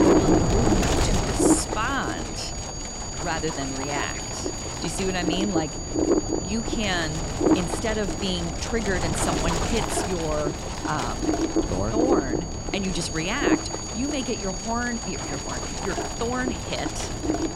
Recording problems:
wind noise on the microphone; heavy; 1 dB above the speech
high-pitched whine; loud; throughout; 7 kHz, 6 dB below the speech
abrupt cut into speech; at the start

